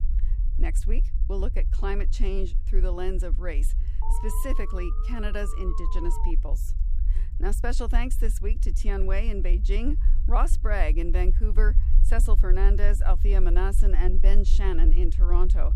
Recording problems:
low rumble; noticeable; throughout; 15 dB below the speech
alarm; noticeable; from 4 to 6.5 s; peak 6 dB below the speech

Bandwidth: 14.5 kHz